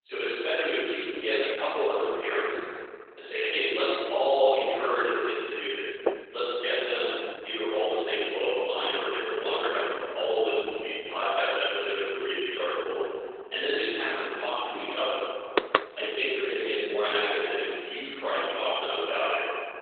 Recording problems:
room echo; strong; dies away in 2.3 s
off-mic speech; far
garbled, watery; badly; nothing above 3.5 kHz
thin; very; fading below 350 Hz
door banging; noticeable; at 6 s; peak 3 dB below the speech
door banging; loud; at 16 s; peak 3 dB above the speech

